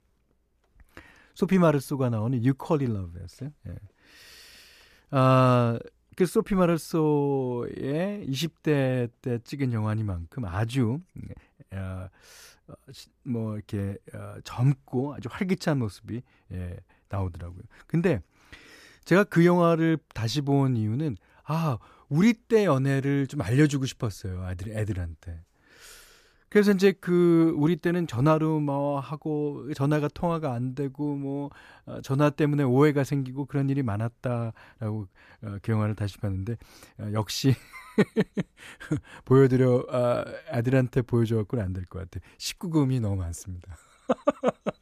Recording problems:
none

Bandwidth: 14.5 kHz